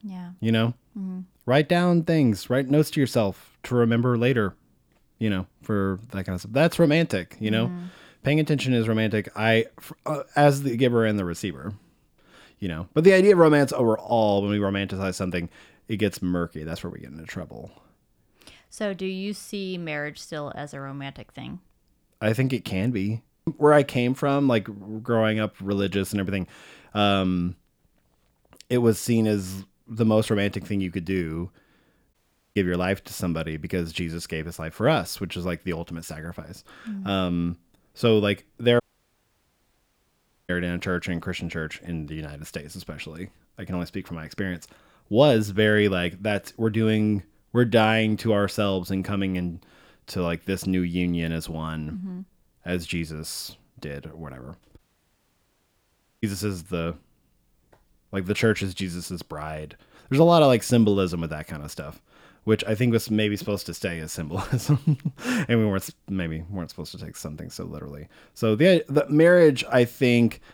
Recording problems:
audio cutting out; at 32 s, at 39 s for 1.5 s and at 55 s for 1.5 s

